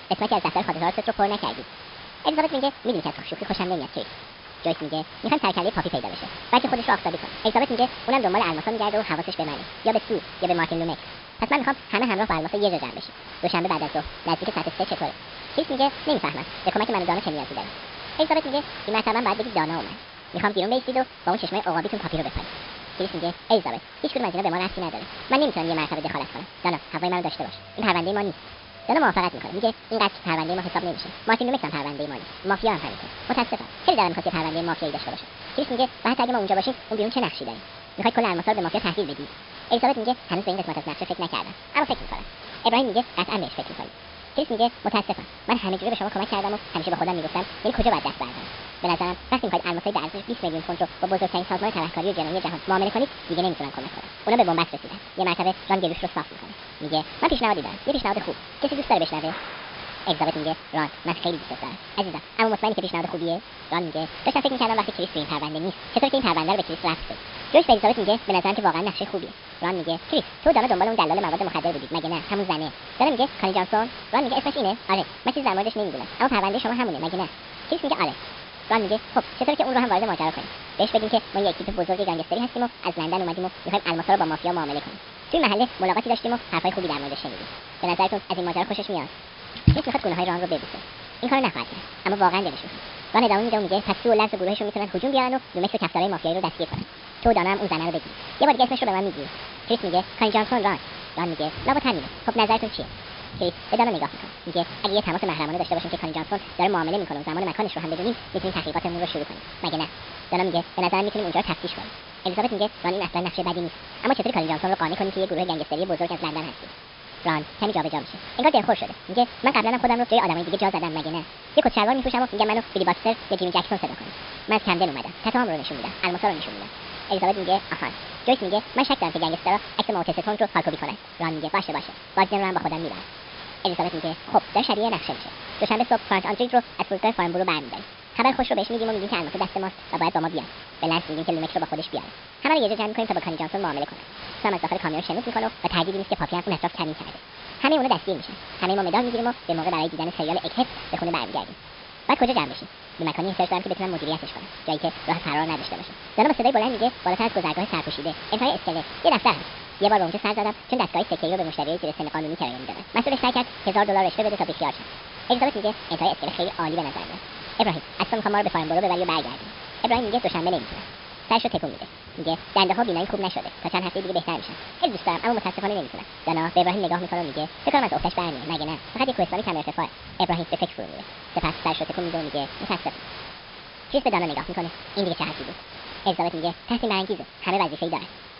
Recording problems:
wrong speed and pitch; too fast and too high; 1.7 times normal speed
high frequencies cut off; noticeable; nothing above 5.5 kHz
rain or running water; noticeable; throughout; 20 dB below the speech
hiss; noticeable; throughout; 15 dB below the speech

